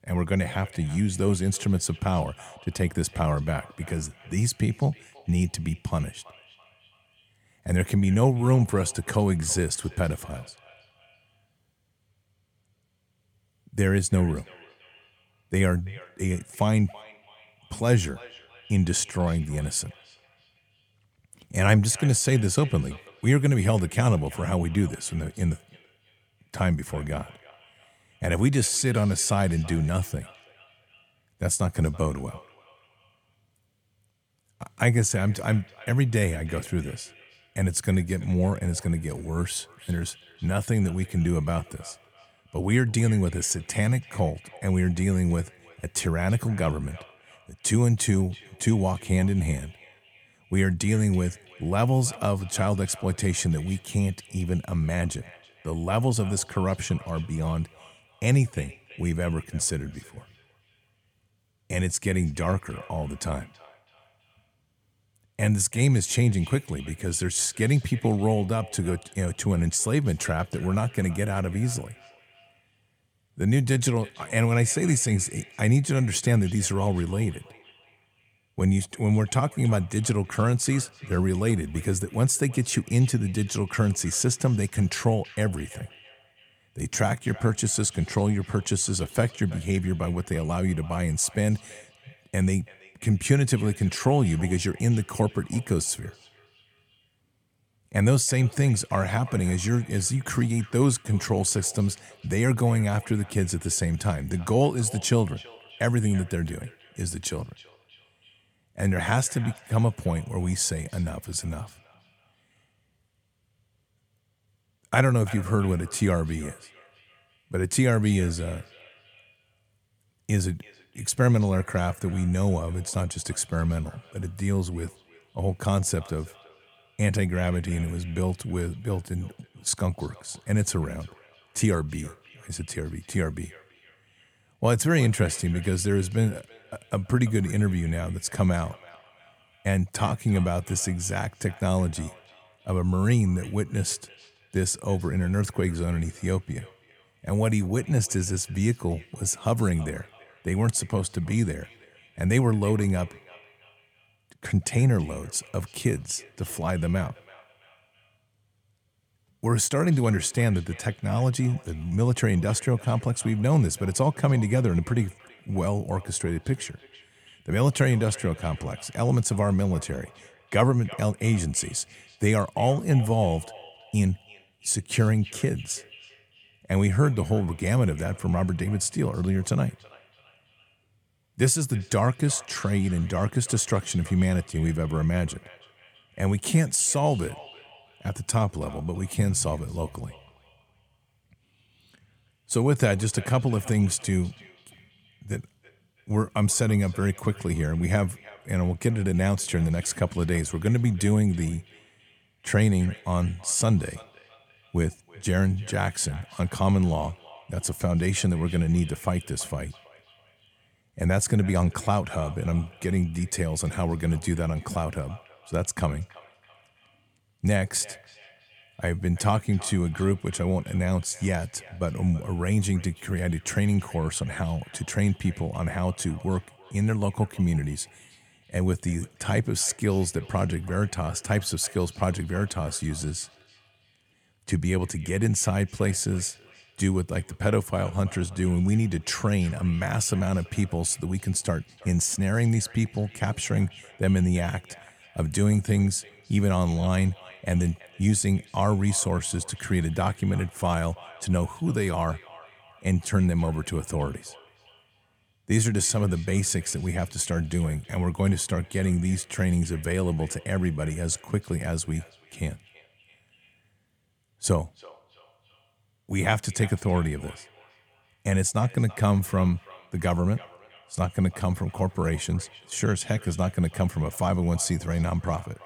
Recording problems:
echo of what is said; faint; throughout; 330 ms later, 25 dB below the speech

